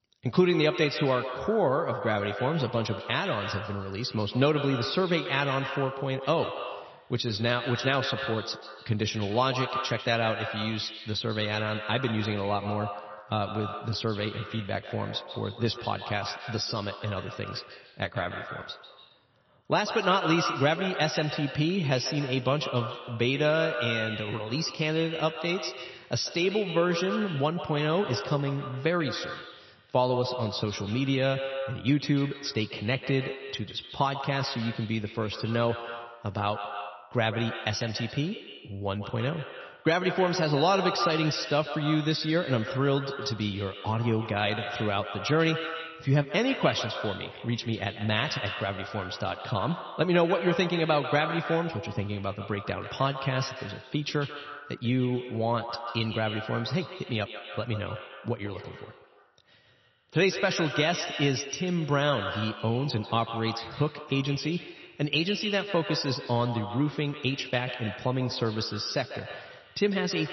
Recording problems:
echo of what is said; strong; throughout; 140 ms later, 8 dB below the speech
garbled, watery; slightly; nothing above 6 kHz

